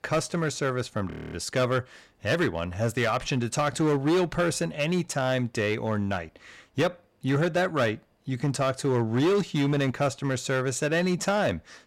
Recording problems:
distortion; slight; 9% of the sound clipped
audio freezing; at 1 s

